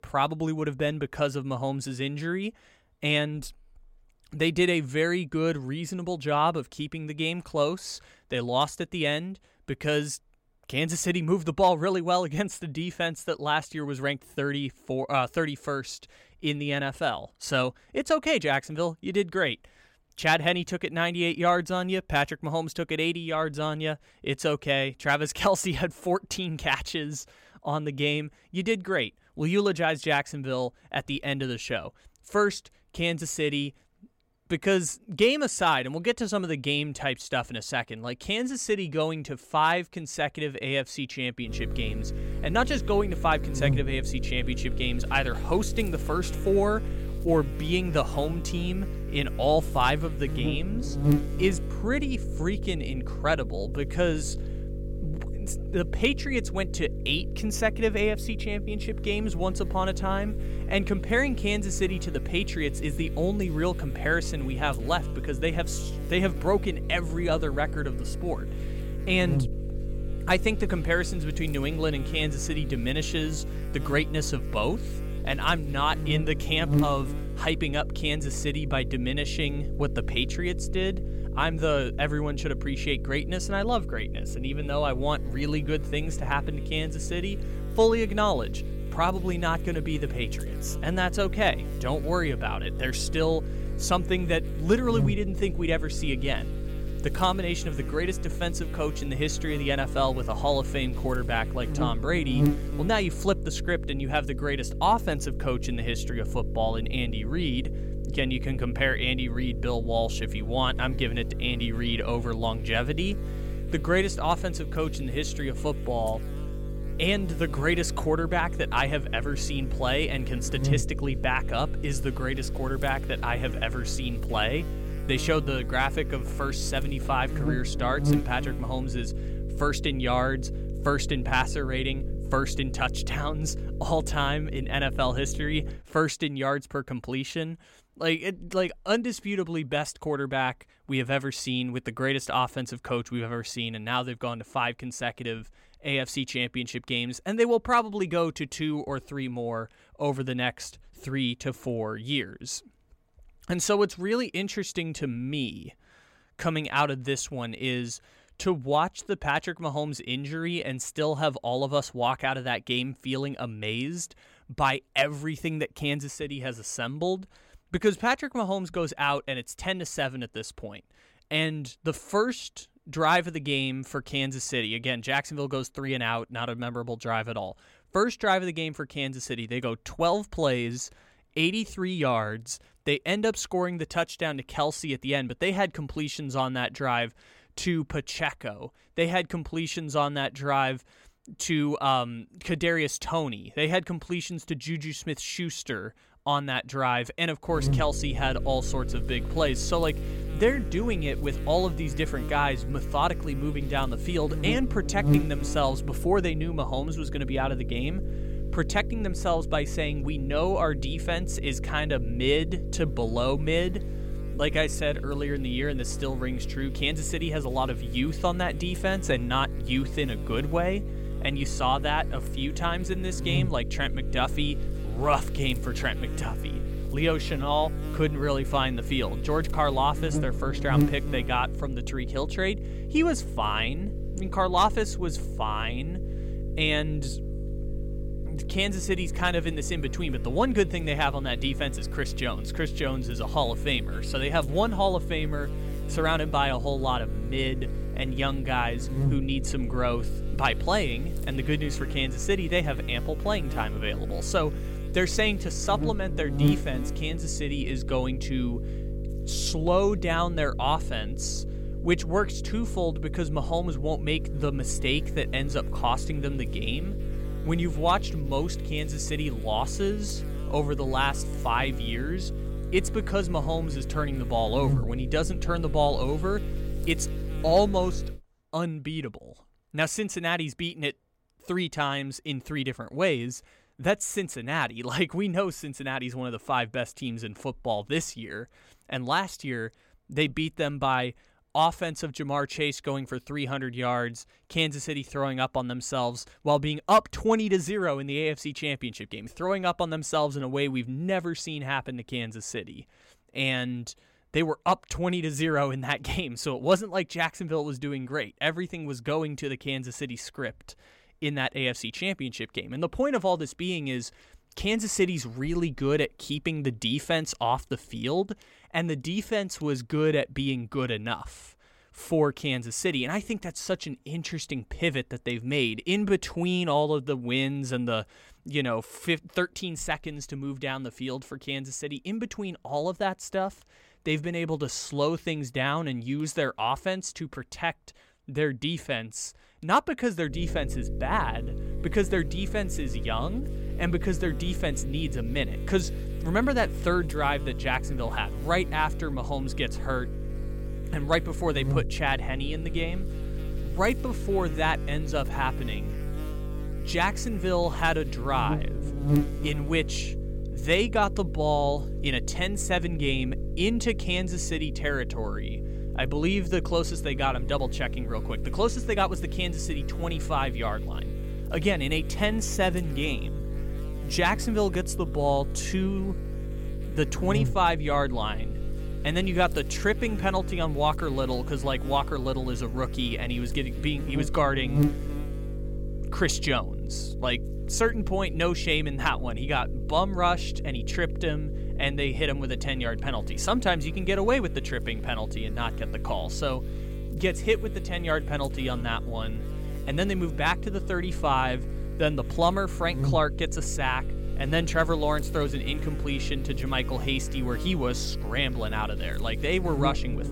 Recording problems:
electrical hum; noticeable; from 41 s to 2:16, from 3:18 to 4:38 and from 5:40 on; 50 Hz, 15 dB below the speech

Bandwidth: 16.5 kHz